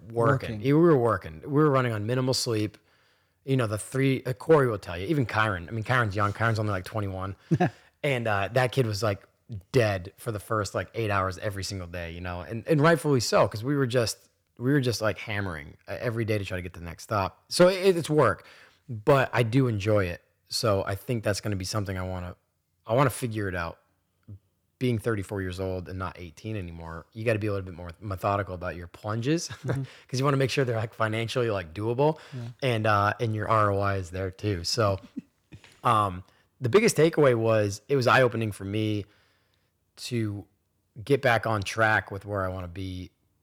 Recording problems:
none

